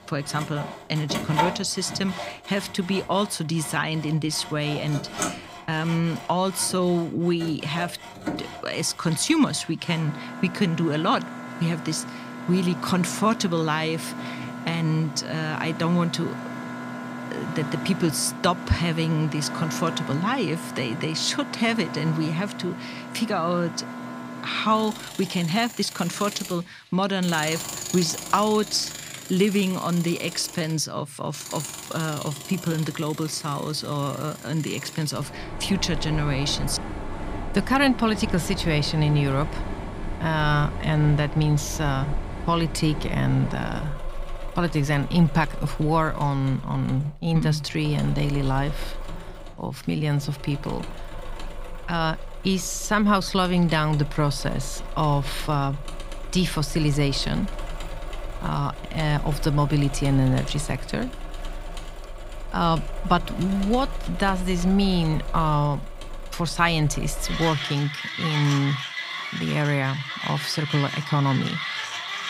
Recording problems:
machinery noise; loud; throughout; 10 dB below the speech

